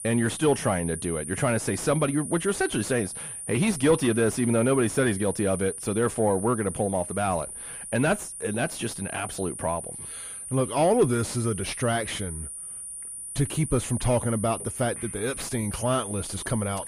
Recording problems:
distortion; slight; 10 dB below the speech
high-pitched whine; loud; throughout; 9.5 kHz, 8 dB below the speech

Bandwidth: 14.5 kHz